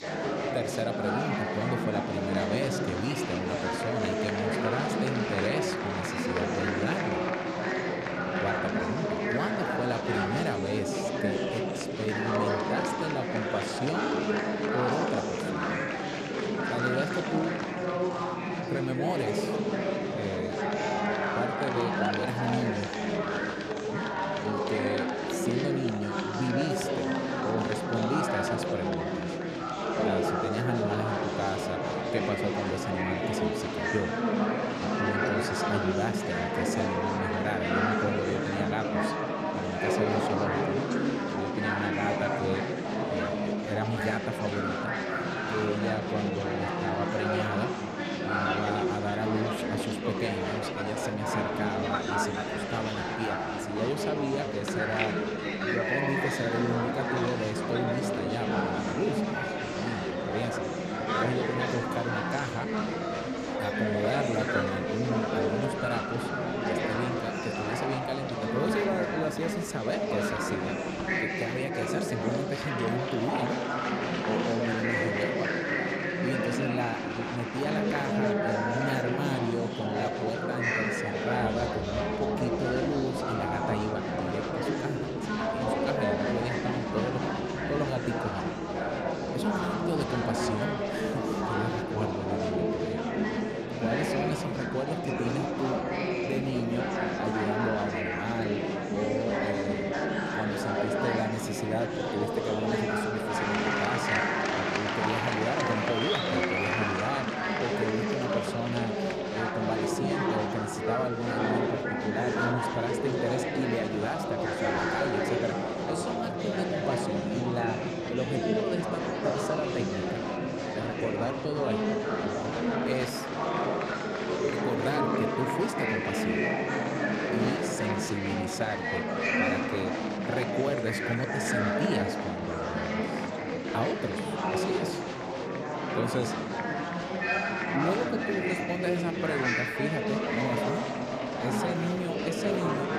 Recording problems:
murmuring crowd; very loud; throughout; 4 dB above the speech

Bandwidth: 14.5 kHz